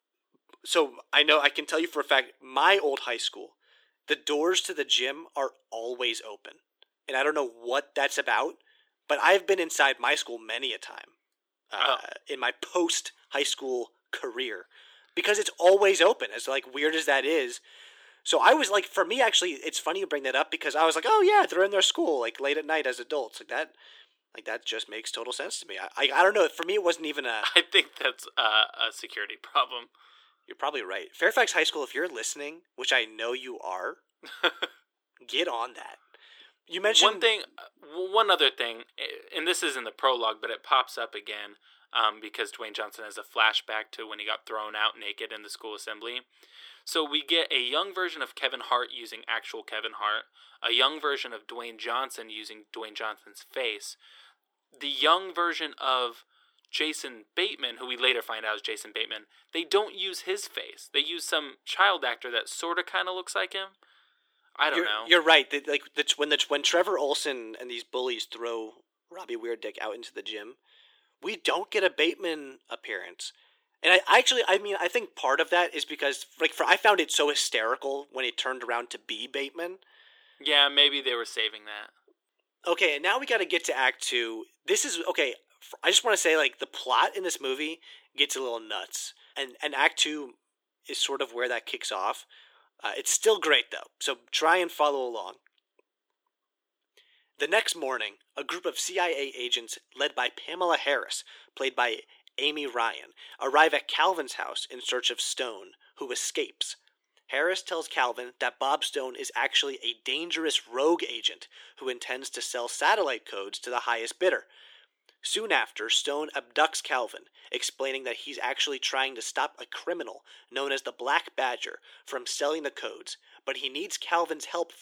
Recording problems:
thin; very; fading below 350 Hz

